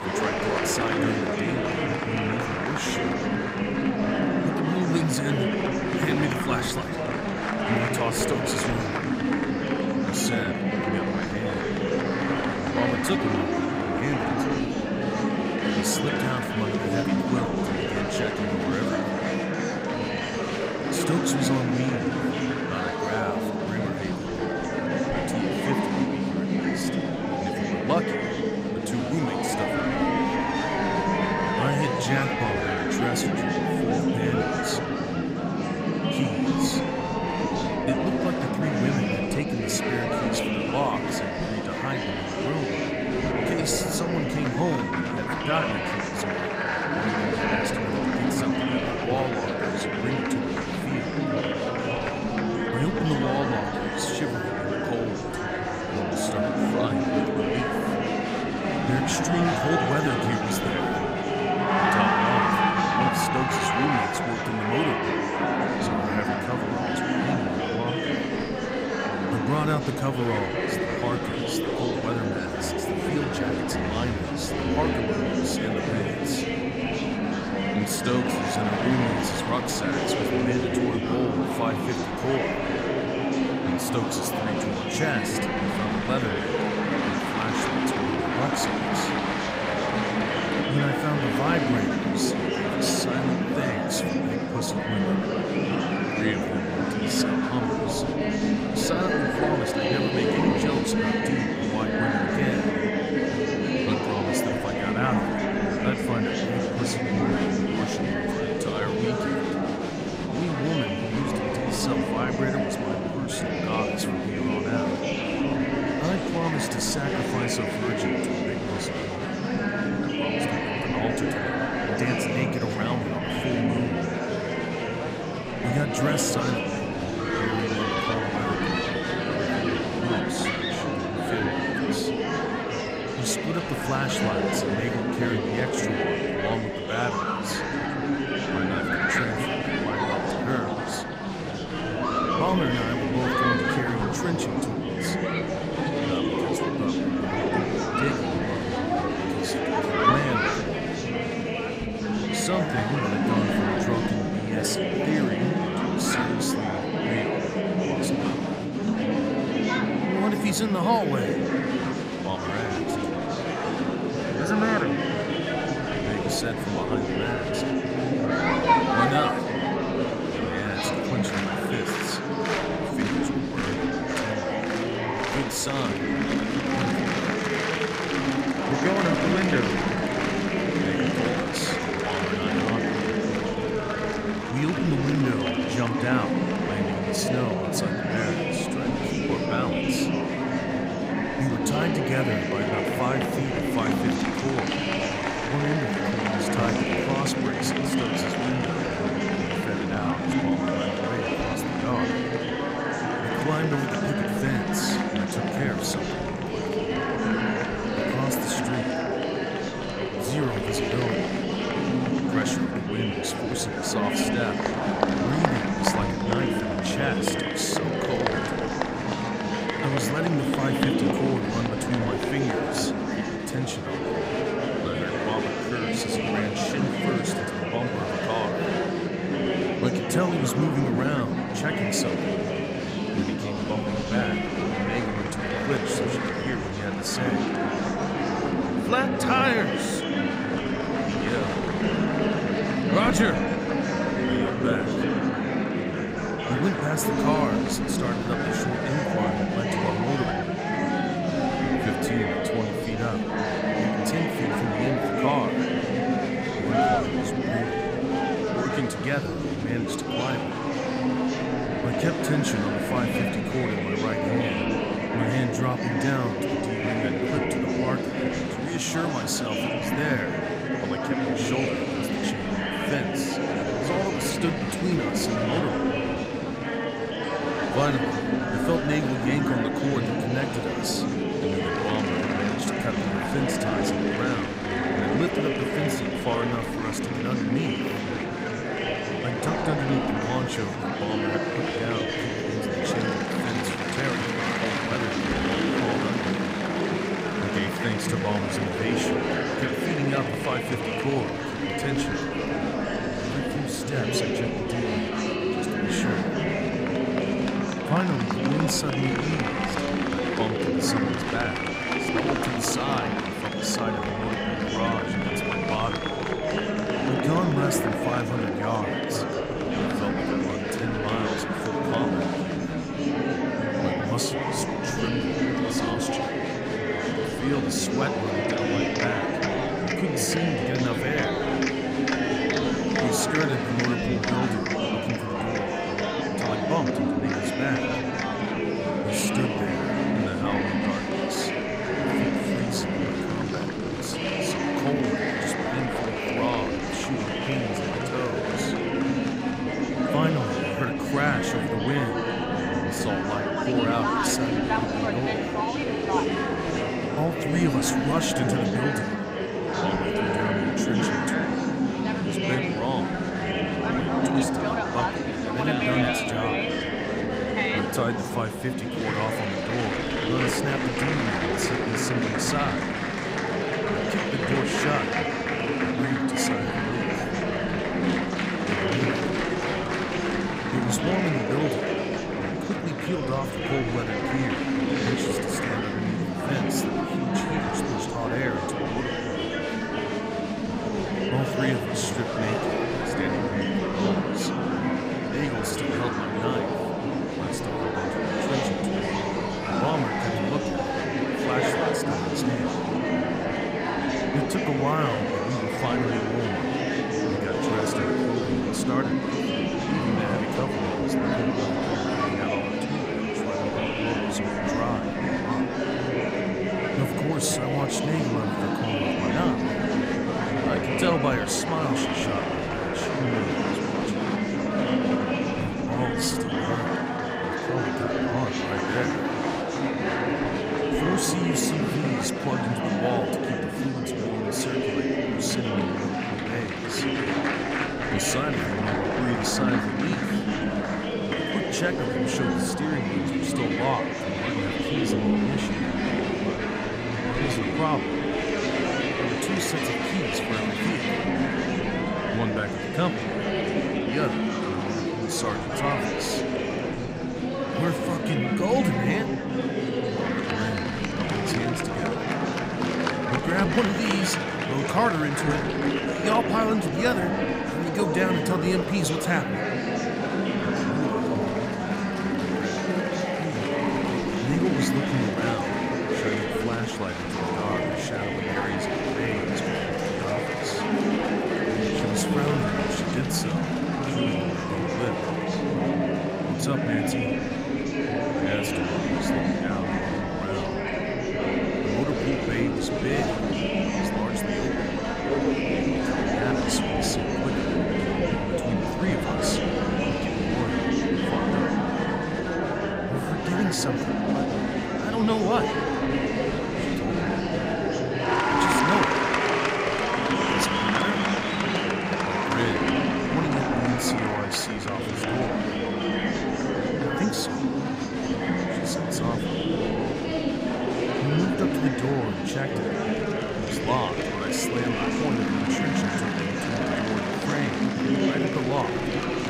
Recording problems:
murmuring crowd; very loud; throughout; 5 dB above the speech

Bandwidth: 15.5 kHz